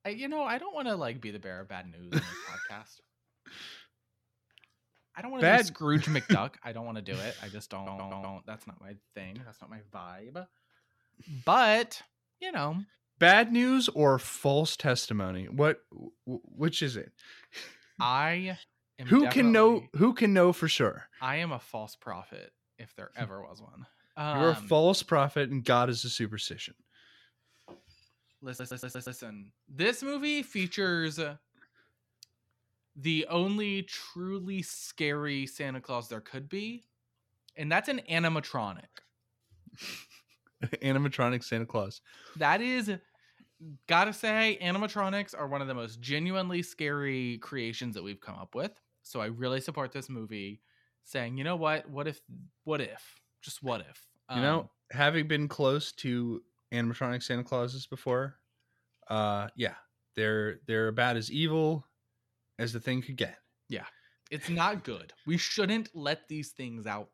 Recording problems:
audio stuttering; at 7.5 s and at 28 s

